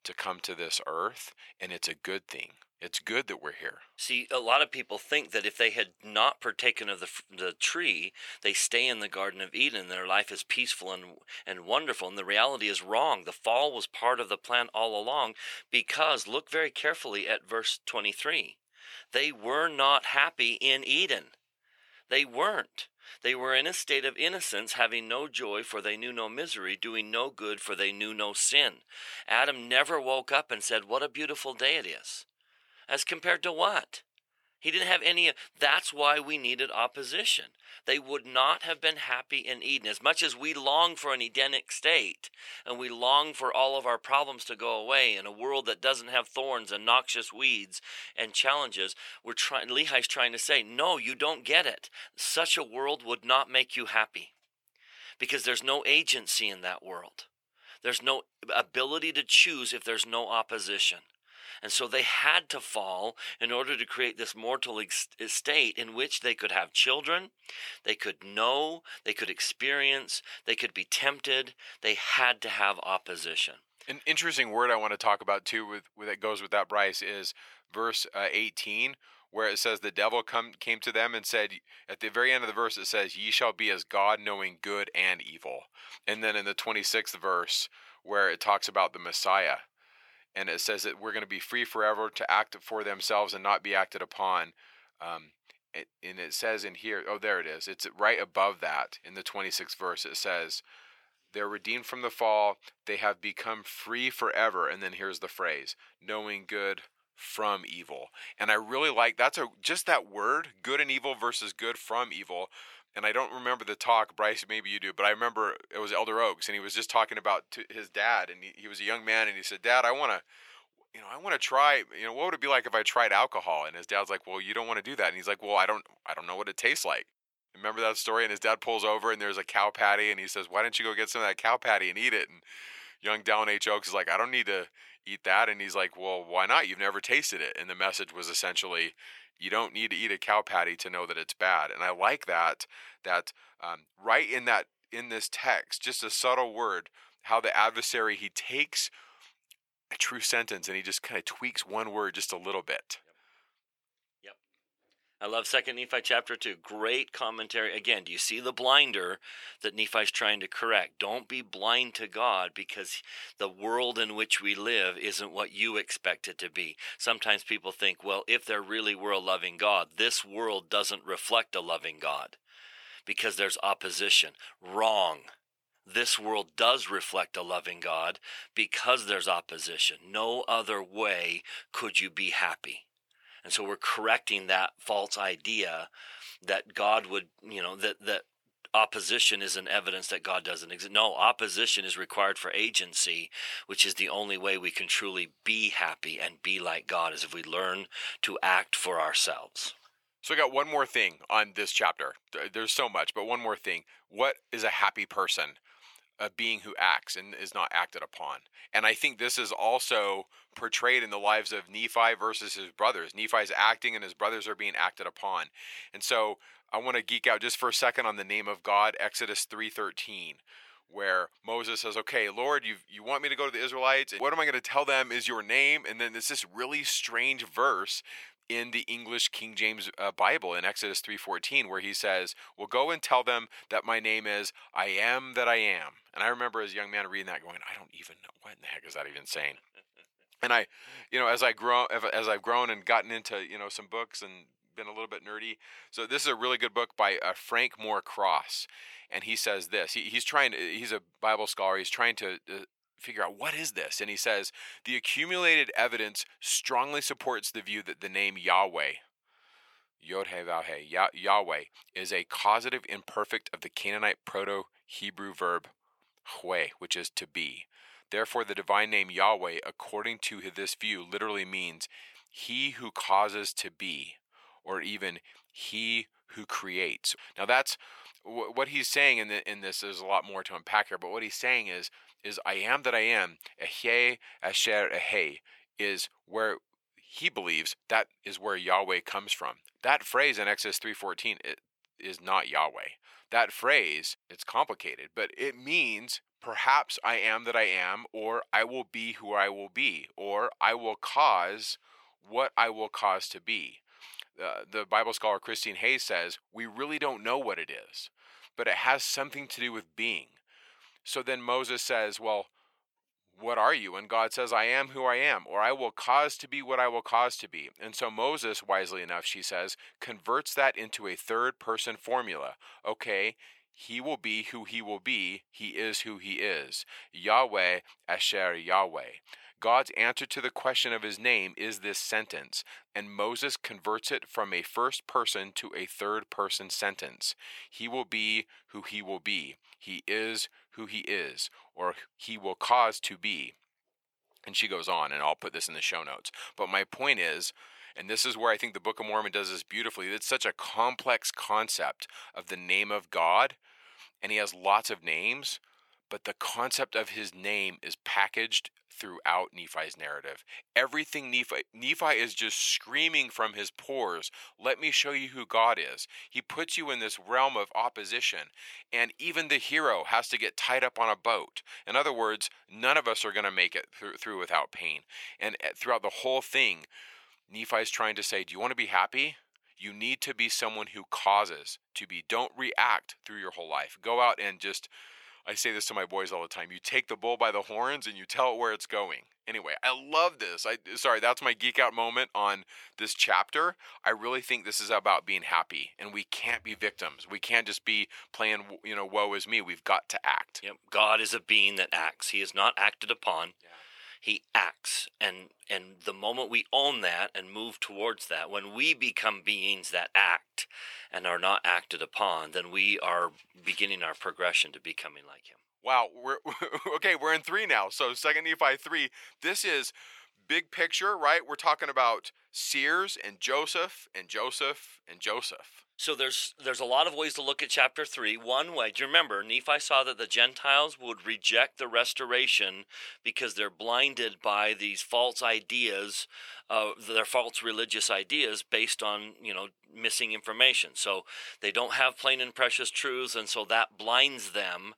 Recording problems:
thin; very; fading below 750 Hz

